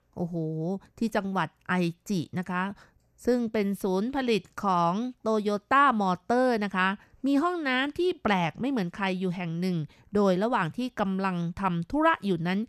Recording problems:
none

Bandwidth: 13.5 kHz